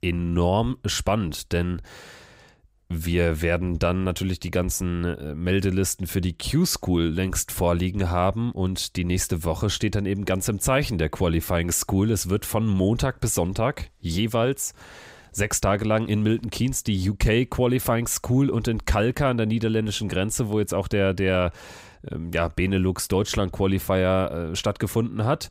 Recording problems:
none

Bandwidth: 15.5 kHz